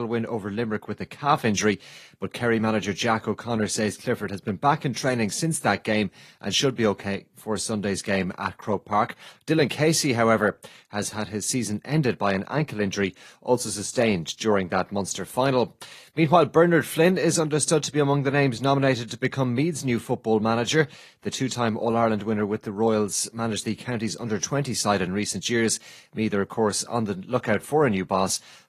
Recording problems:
garbled, watery; slightly
abrupt cut into speech; at the start

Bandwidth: 14.5 kHz